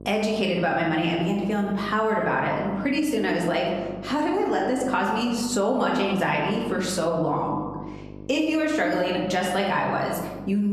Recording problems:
room echo; slight; dies away in 1 s
off-mic speech; somewhat distant
squashed, flat; somewhat
electrical hum; faint; throughout; 50 Hz, 25 dB below the speech
abrupt cut into speech; at the end

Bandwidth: 13.5 kHz